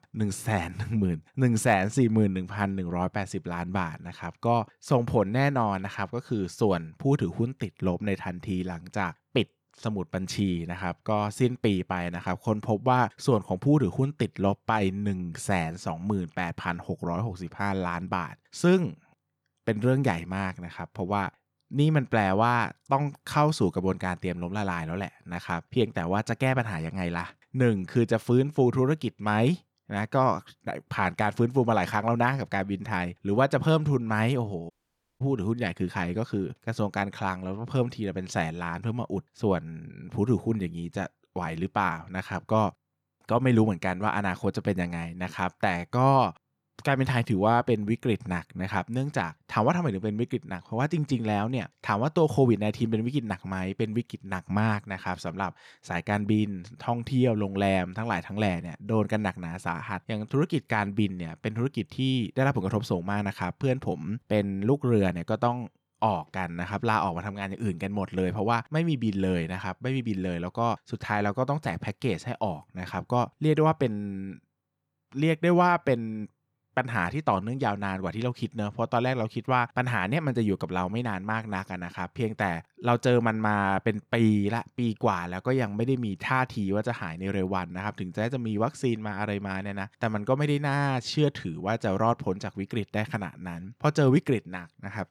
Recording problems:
audio cutting out; at 35 s for 0.5 s

